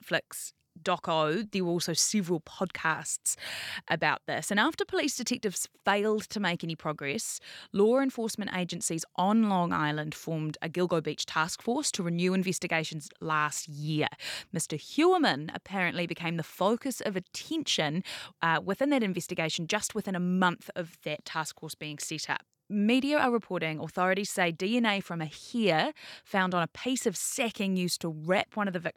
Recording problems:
none

